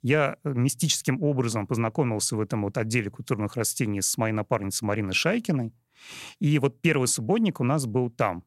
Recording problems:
none

